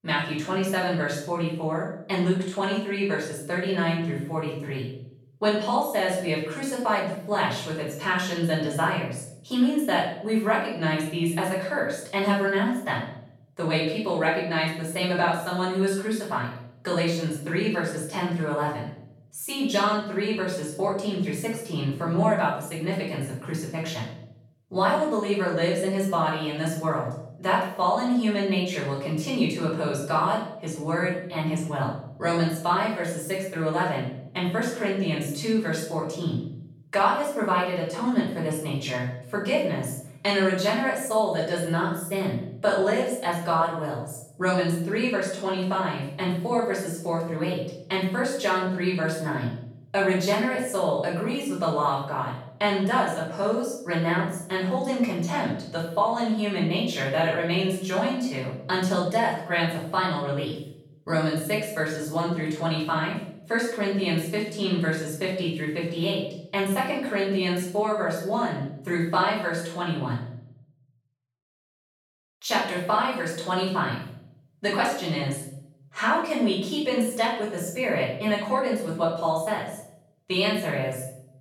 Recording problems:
off-mic speech; far
room echo; noticeable; dies away in 0.6 s

